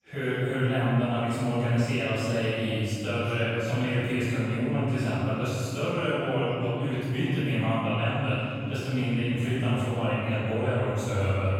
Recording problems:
room echo; strong; dies away in 2.5 s
off-mic speech; far
background chatter; faint; throughout; 2 voices, 20 dB below the speech

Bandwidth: 16 kHz